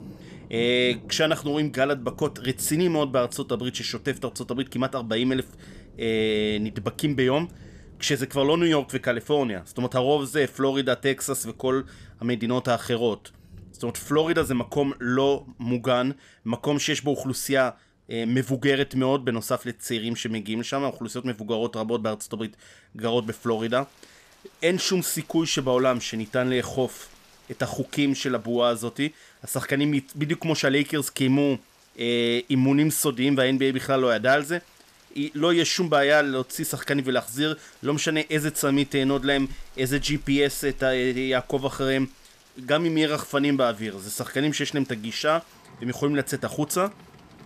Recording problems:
rain or running water; faint; throughout; 25 dB below the speech

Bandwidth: 14.5 kHz